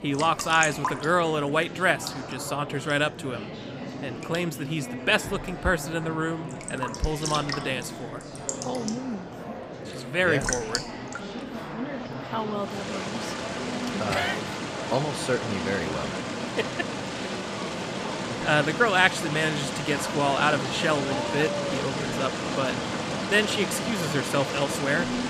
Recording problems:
rain or running water; loud; throughout; 5 dB below the speech
murmuring crowd; loud; throughout; 9 dB below the speech

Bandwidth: 15 kHz